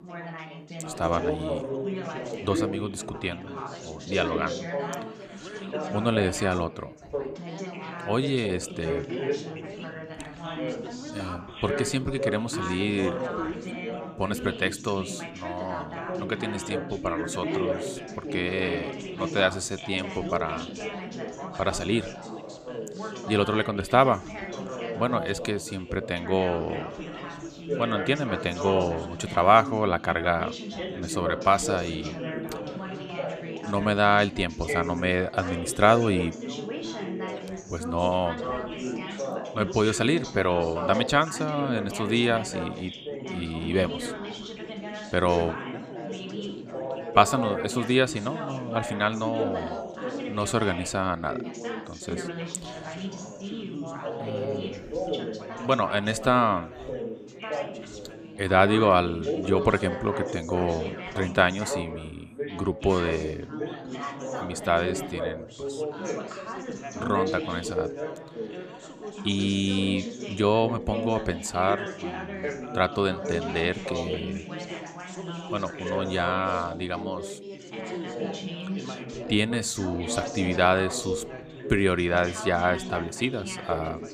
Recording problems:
background chatter; loud; throughout; 4 voices, 7 dB below the speech

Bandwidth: 14.5 kHz